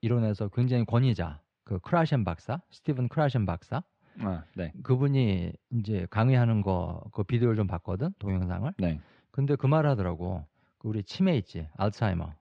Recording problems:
muffled; slightly; fading above 2.5 kHz

